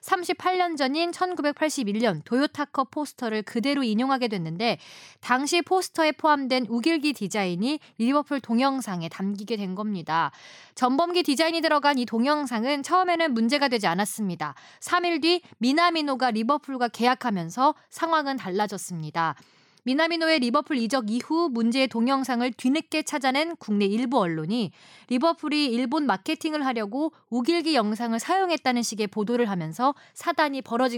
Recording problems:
abrupt cut into speech; at the end

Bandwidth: 17.5 kHz